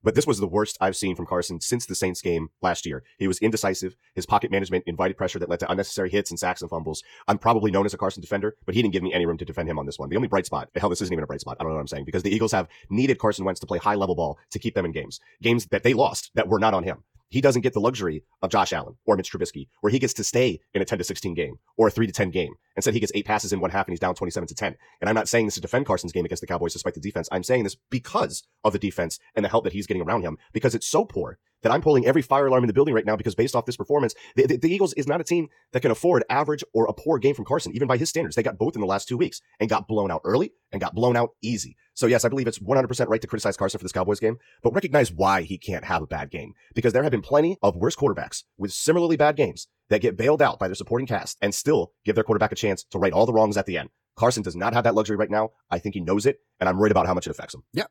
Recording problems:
wrong speed, natural pitch; too fast; 1.6 times normal speed

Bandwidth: 18 kHz